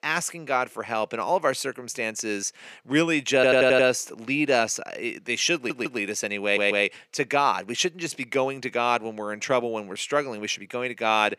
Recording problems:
thin; somewhat; fading below 350 Hz
audio stuttering; at 3.5 s, at 5.5 s and at 6.5 s

